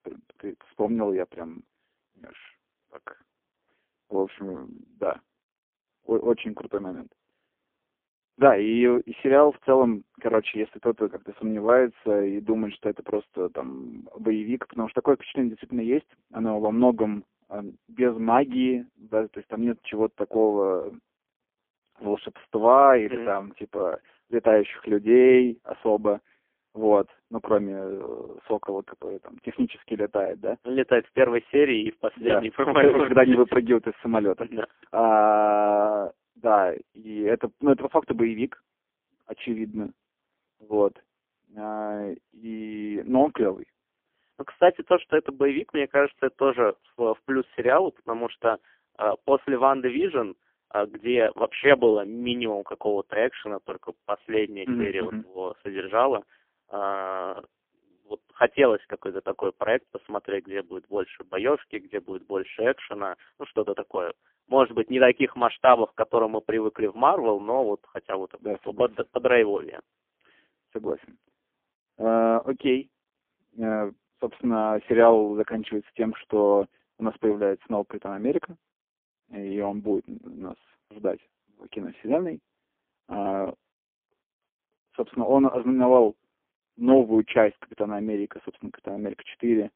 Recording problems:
phone-call audio; poor line; nothing above 3.5 kHz

